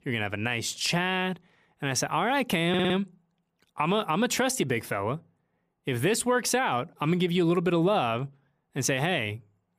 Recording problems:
audio stuttering; at 2.5 s

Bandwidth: 15 kHz